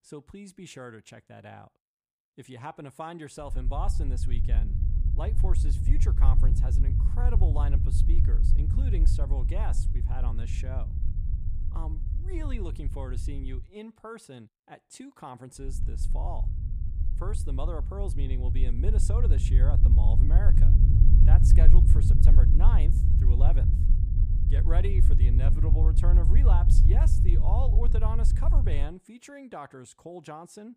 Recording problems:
low rumble; loud; from 3.5 to 14 s and from 16 to 29 s; 2 dB below the speech

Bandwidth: 15 kHz